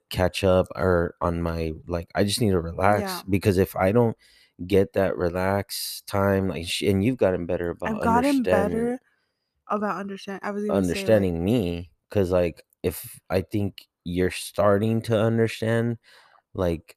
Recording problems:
none

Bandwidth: 14.5 kHz